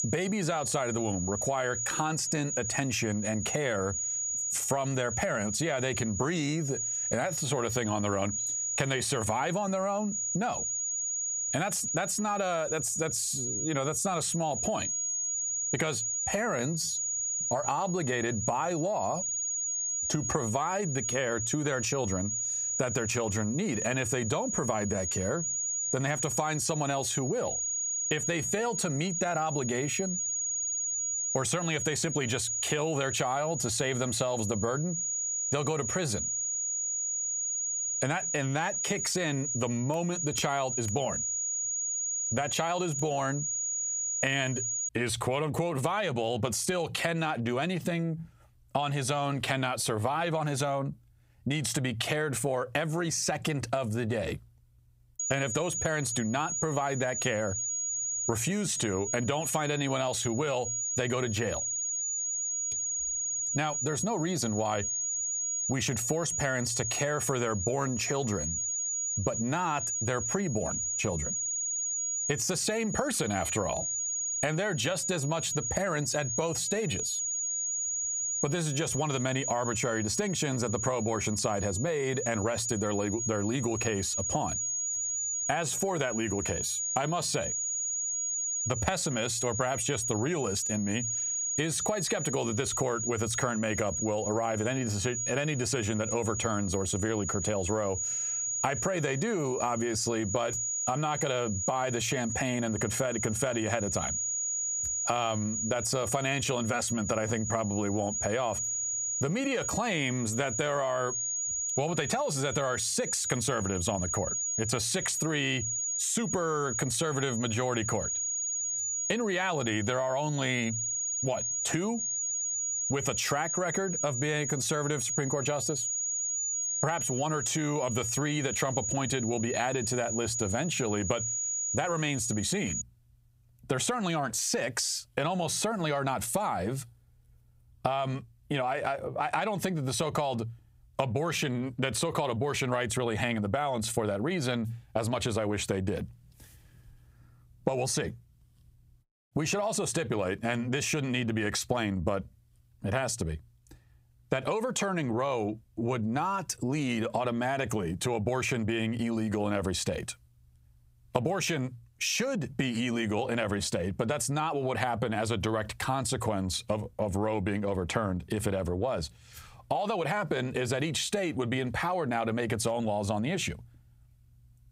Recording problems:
squashed, flat; heavily
high-pitched whine; loud; until 45 s and from 55 s to 2:13; 7 kHz, 2 dB below the speech

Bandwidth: 15.5 kHz